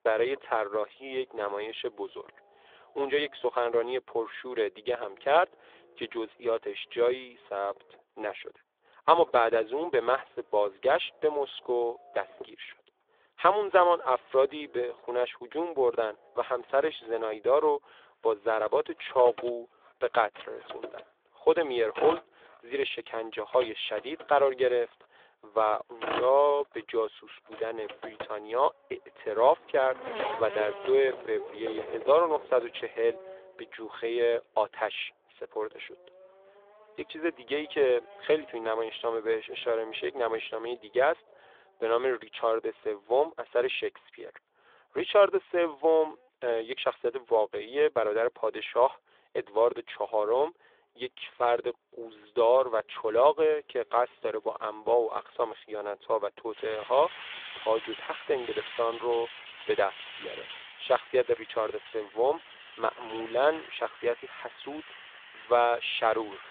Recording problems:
phone-call audio
traffic noise; noticeable; throughout; 15 dB below the speech

